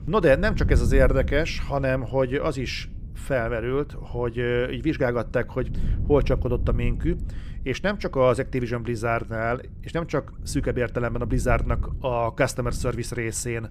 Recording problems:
wind noise on the microphone; occasional gusts; 20 dB below the speech

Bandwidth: 15 kHz